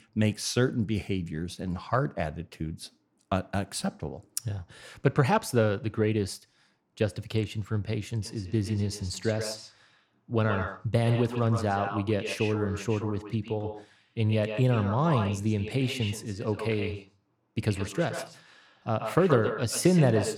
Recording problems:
echo of what is said; strong; from 8 s on; 130 ms later, 9 dB below the speech

